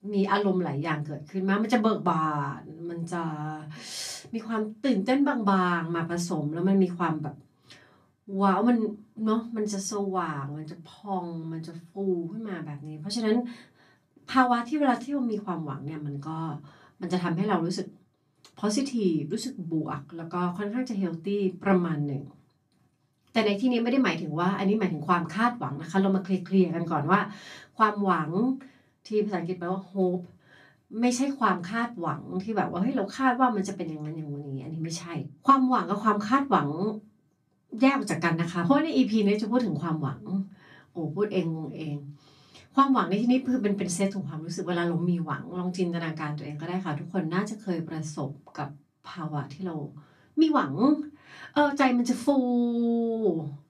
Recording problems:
off-mic speech; far
room echo; very slight; dies away in 0.2 s

